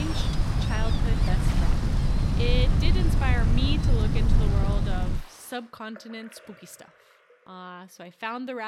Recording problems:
wind noise on the microphone; heavy; until 5 s; 3 dB below the speech
rain or running water; loud; throughout; 6 dB below the speech
abrupt cut into speech; at the start and the end

